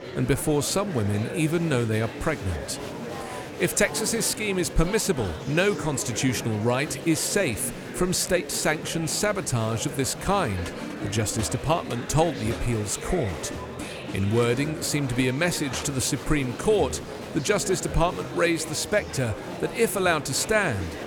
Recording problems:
murmuring crowd; loud; throughout; 10 dB below the speech

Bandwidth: 17.5 kHz